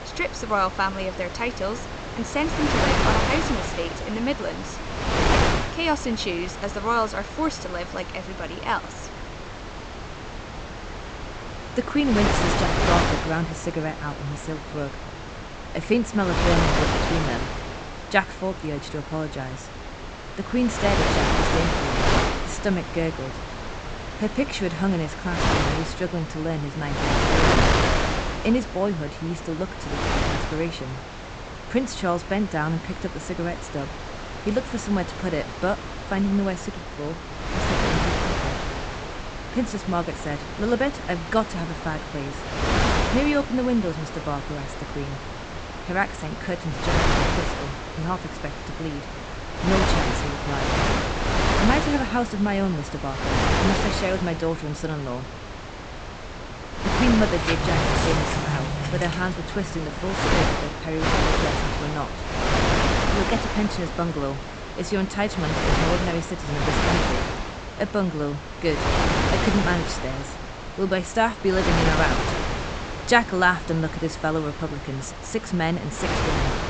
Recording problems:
high frequencies cut off; noticeable; nothing above 8 kHz
wind noise on the microphone; heavy; 1 dB above the speech
door banging; loud; from 57 s to 1:01; peak 1 dB above the speech

